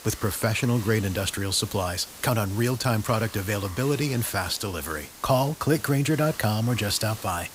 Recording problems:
hiss; noticeable; throughout; 15 dB below the speech

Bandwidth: 15.5 kHz